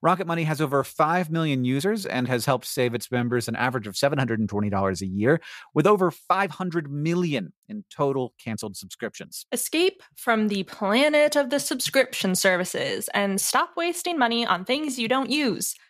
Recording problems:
uneven, jittery; strongly; from 0.5 to 15 s

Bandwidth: 14.5 kHz